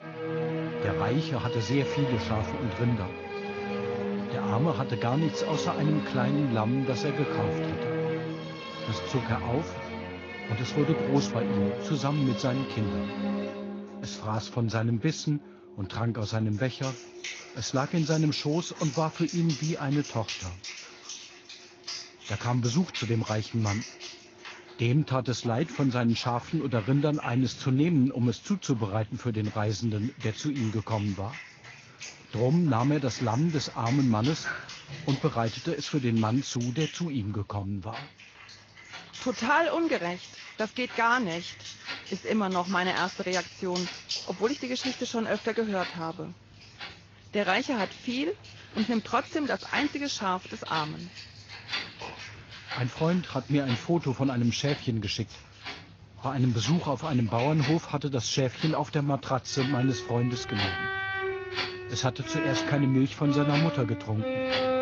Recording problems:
garbled, watery; slightly; nothing above 6.5 kHz
background music; loud; throughout; 7 dB below the speech
household noises; noticeable; throughout; 15 dB below the speech

